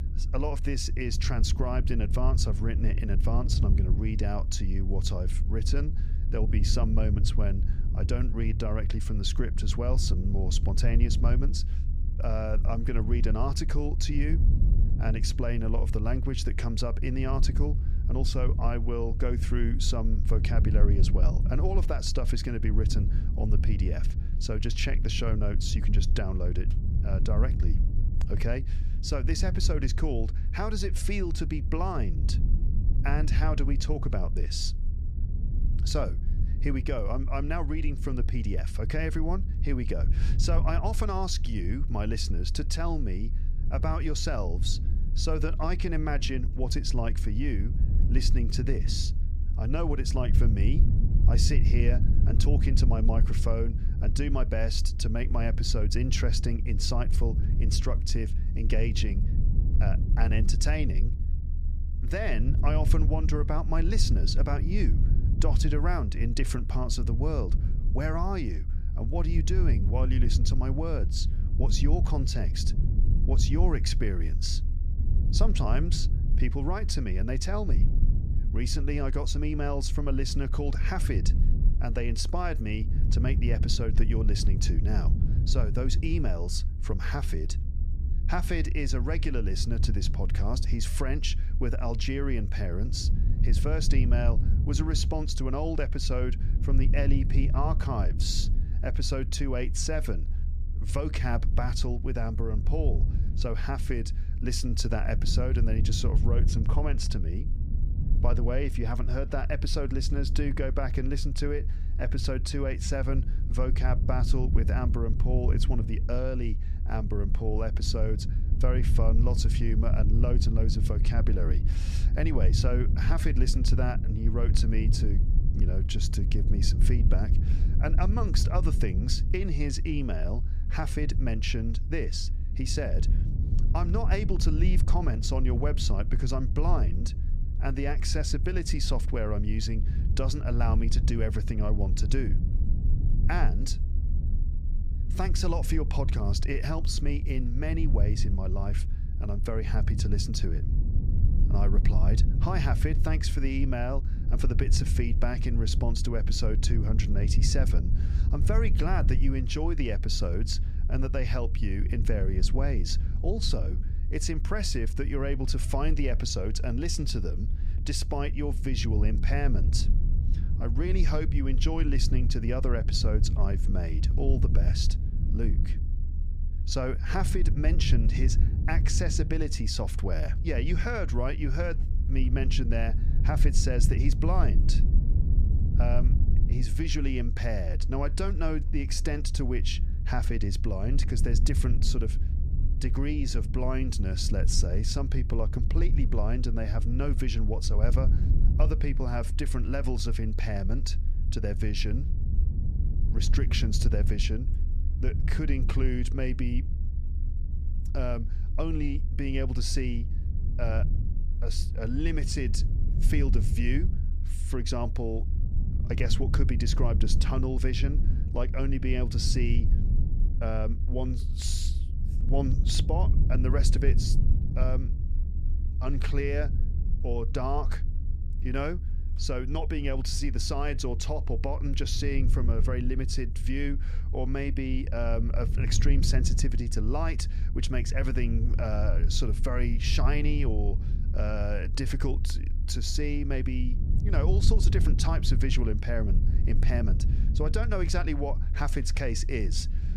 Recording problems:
low rumble; noticeable; throughout; 10 dB below the speech

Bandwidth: 15 kHz